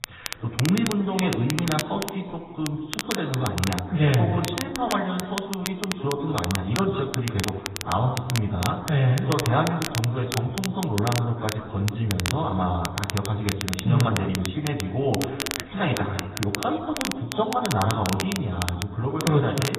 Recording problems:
off-mic speech; far
garbled, watery; badly; nothing above 4 kHz
room echo; slight; dies away in 1.2 s
crackle, like an old record; very faint; 7 dB below the speech

